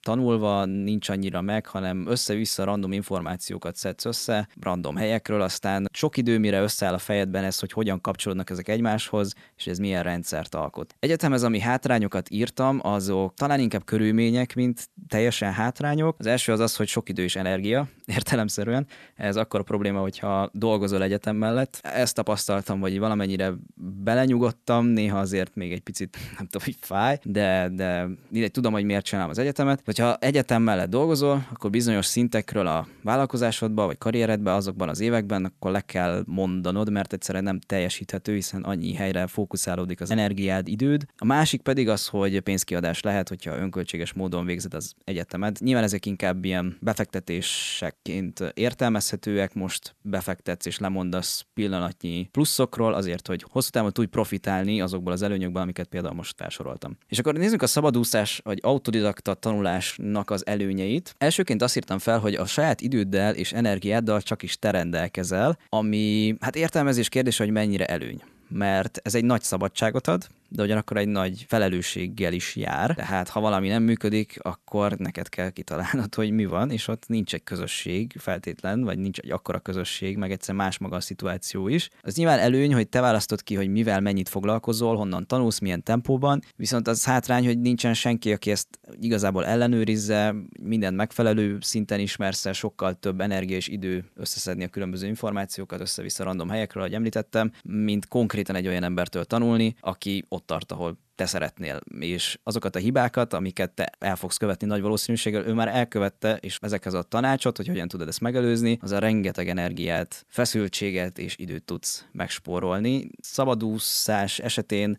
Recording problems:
none

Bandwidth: 13.5 kHz